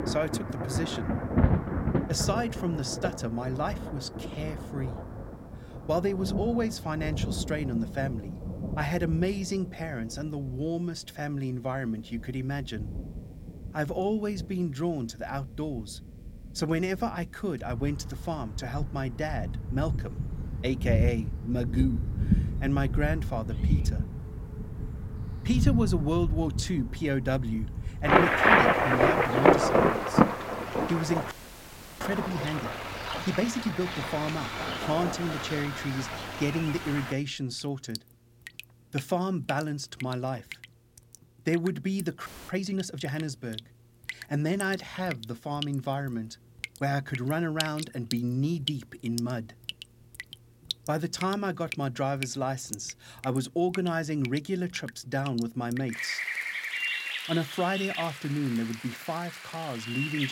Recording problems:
rain or running water; very loud; throughout; 1 dB above the speech
audio freezing; at 31 s for 0.5 s and at 42 s
abrupt cut into speech; at the end

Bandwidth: 16.5 kHz